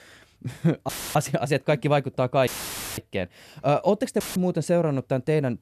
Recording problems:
audio cutting out; filled with static; at 1 s, at 2.5 s for 0.5 s and at 4 s

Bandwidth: 13.5 kHz